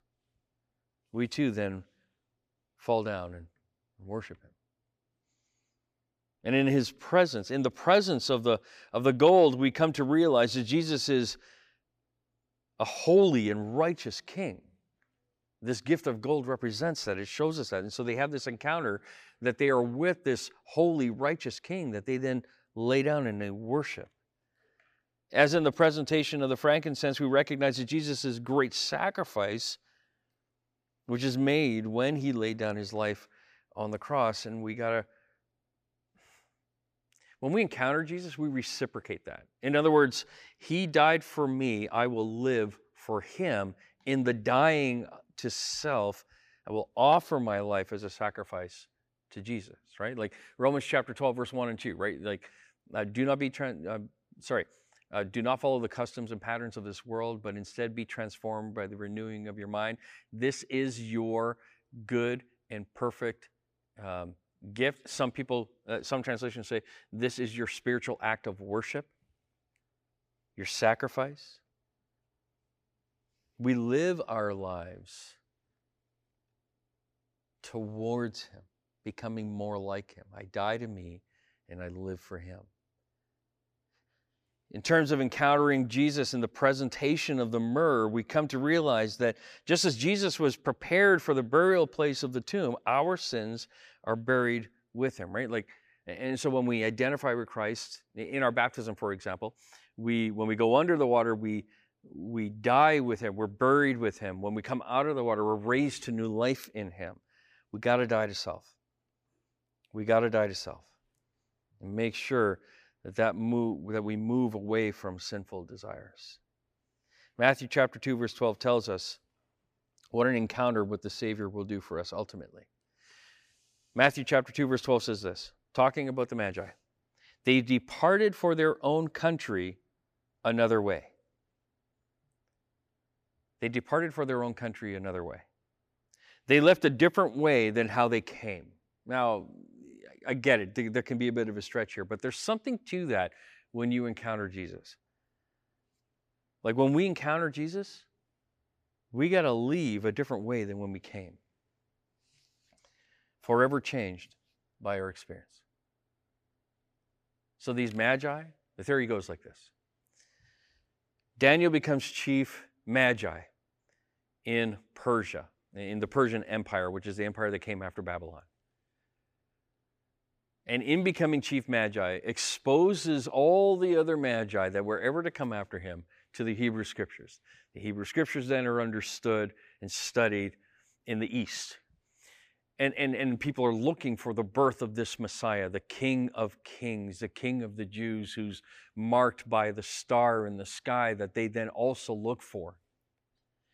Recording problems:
none

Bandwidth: 15 kHz